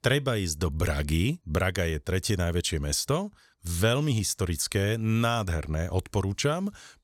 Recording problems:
none

